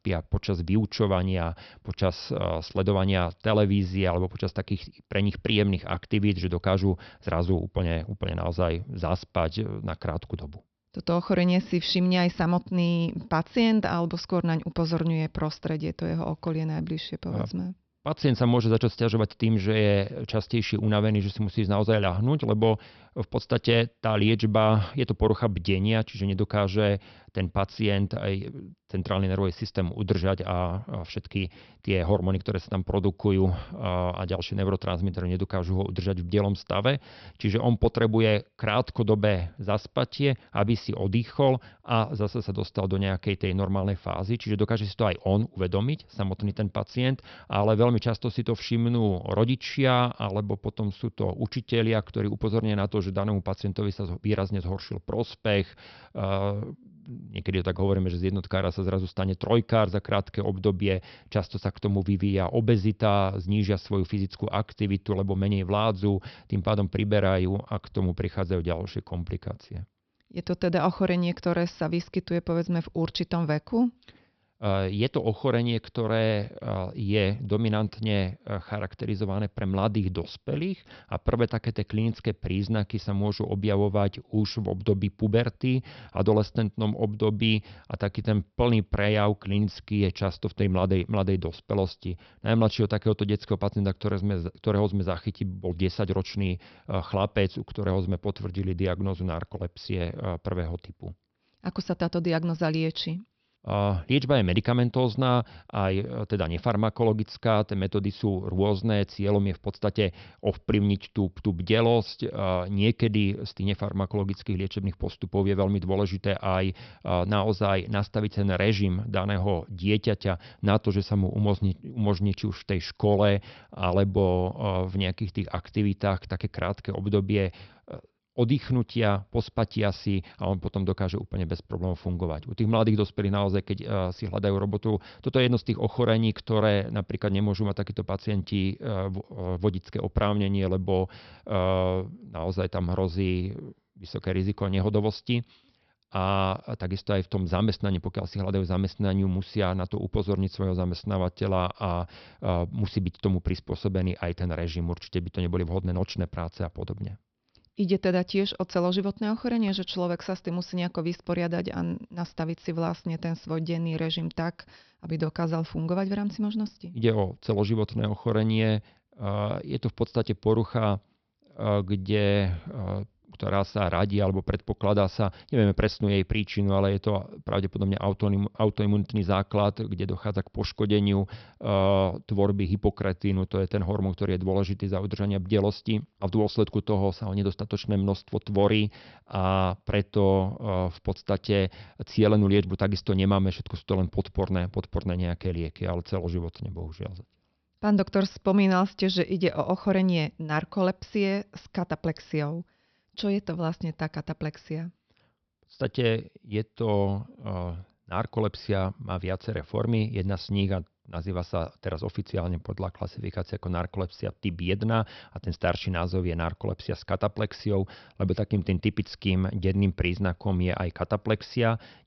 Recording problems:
high frequencies cut off; noticeable; nothing above 5.5 kHz

